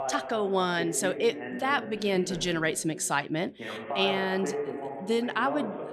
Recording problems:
voice in the background; loud; throughout; 8 dB below the speech

